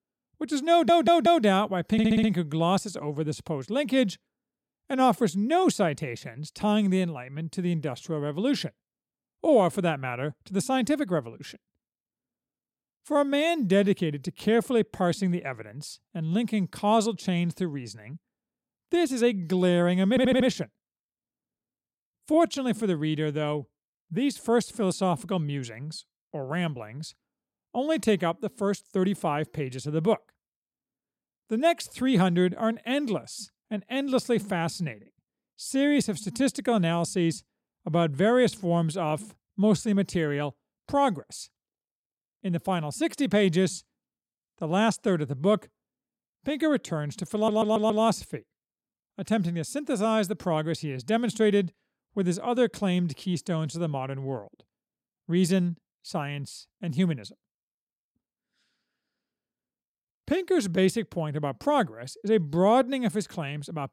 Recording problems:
audio stuttering; 4 times, first at 0.5 s

